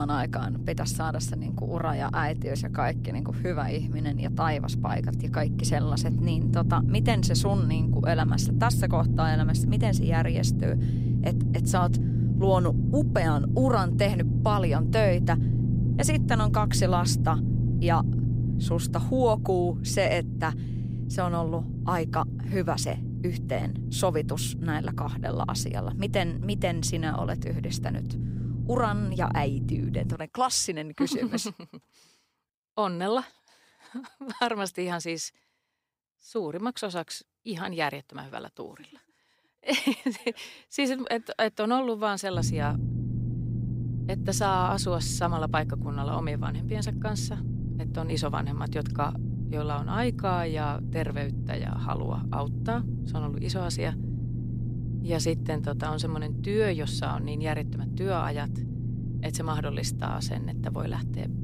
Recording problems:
low rumble; loud; until 30 s and from 42 s on; 9 dB below the speech
abrupt cut into speech; at the start

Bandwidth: 15.5 kHz